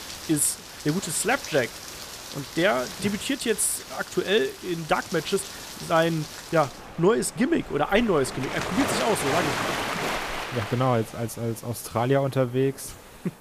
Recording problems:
rain or running water; loud; throughout; 7 dB below the speech

